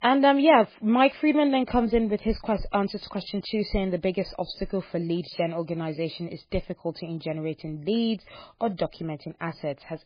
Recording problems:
garbled, watery; badly; nothing above 4.5 kHz

